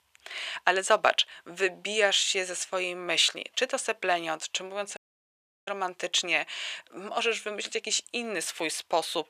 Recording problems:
thin; very; fading below 750 Hz
audio cutting out; at 5 s for 0.5 s

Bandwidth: 14.5 kHz